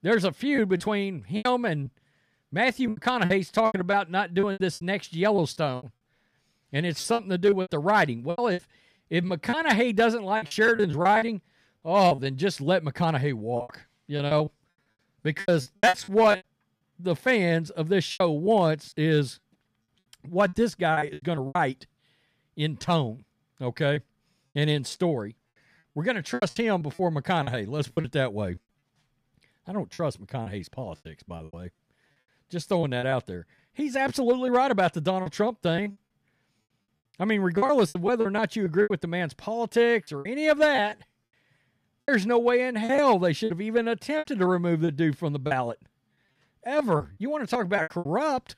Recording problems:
choppy; very; 12% of the speech affected

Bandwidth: 14.5 kHz